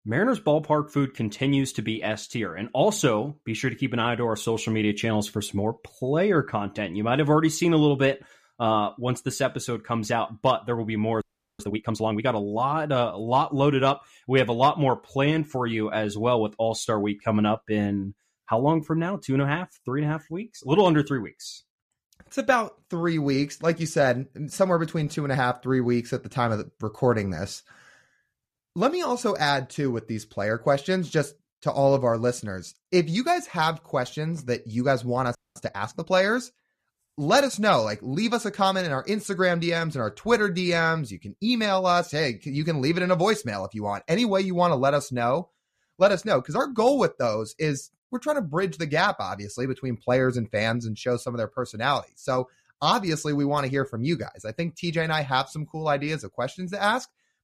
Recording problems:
audio freezing; at 11 s and at 35 s

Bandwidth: 14.5 kHz